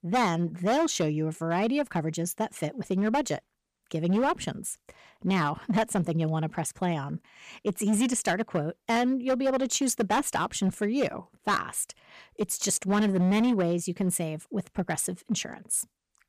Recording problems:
distortion; slight; 7% of the sound clipped

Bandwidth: 14.5 kHz